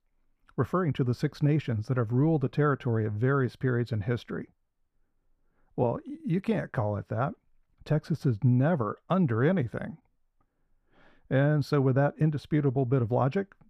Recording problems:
muffled; slightly; fading above 2 kHz

